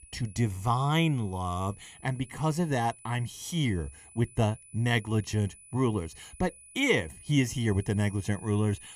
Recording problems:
high-pitched whine; faint; throughout; 10 kHz, 20 dB below the speech

